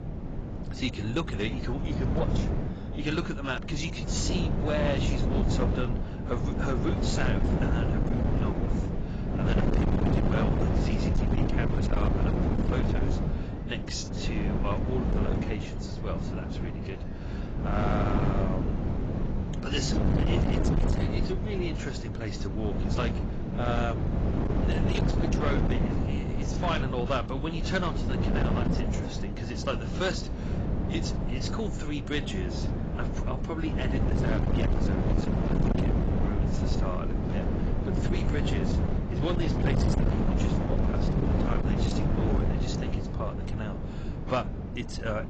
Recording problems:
garbled, watery; badly; nothing above 7.5 kHz
distortion; slight; 13% of the sound clipped
wind noise on the microphone; heavy; 1 dB below the speech
rain or running water; faint; throughout; 25 dB below the speech

